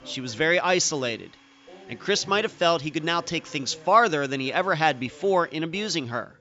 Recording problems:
high frequencies cut off; noticeable; nothing above 8 kHz
household noises; faint; throughout; 30 dB below the speech
background chatter; faint; throughout; 2 voices, 25 dB below the speech

